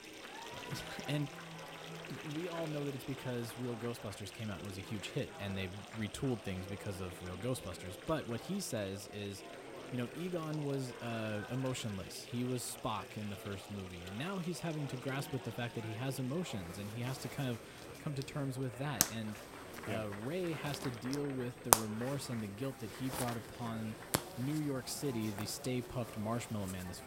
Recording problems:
household noises; loud; throughout; 2 dB below the speech
chatter from many people; loud; throughout; 10 dB below the speech
high-pitched whine; faint; throughout; 8.5 kHz, 25 dB below the speech

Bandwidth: 16 kHz